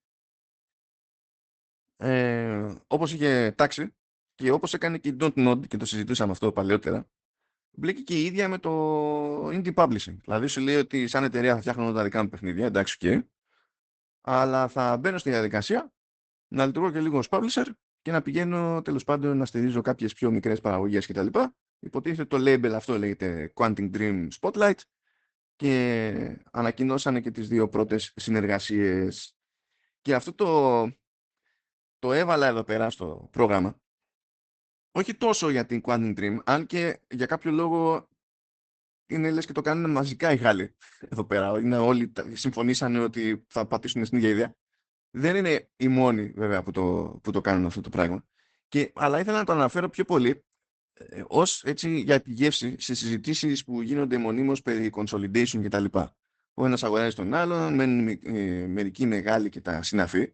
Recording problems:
garbled, watery; badly; nothing above 8 kHz

